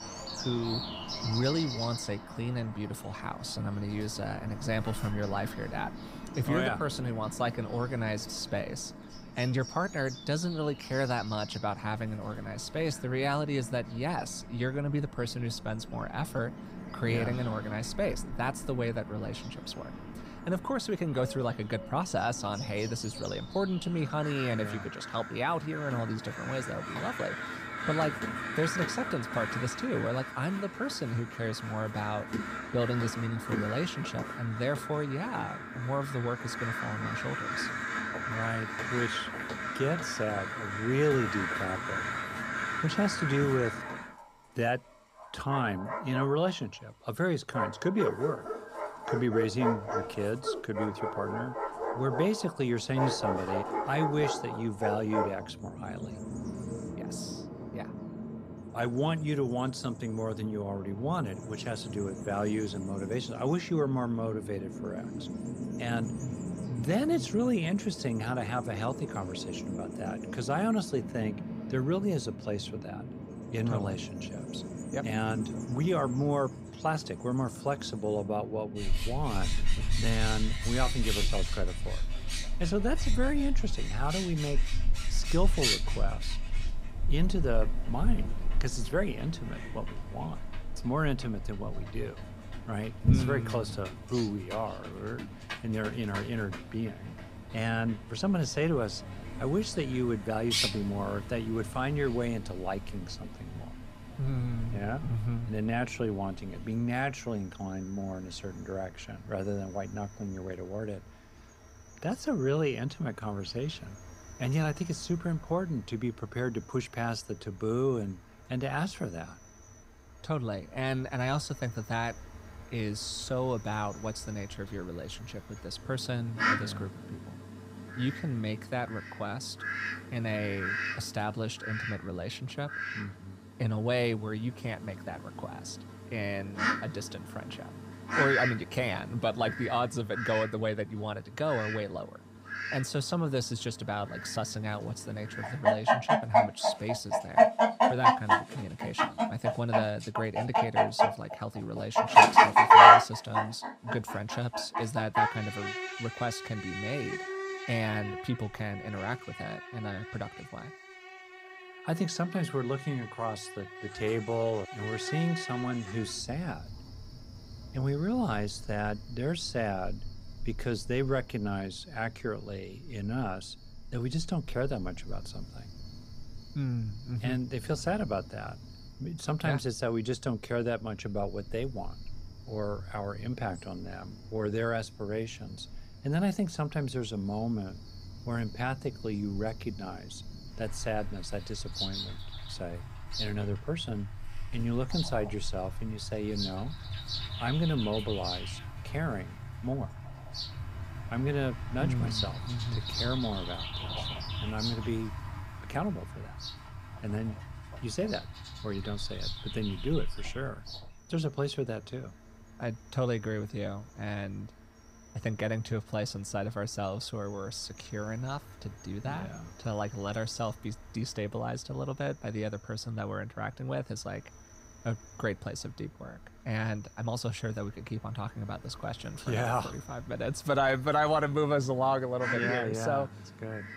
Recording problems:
animal sounds; very loud; throughout; 1 dB above the speech

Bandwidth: 15.5 kHz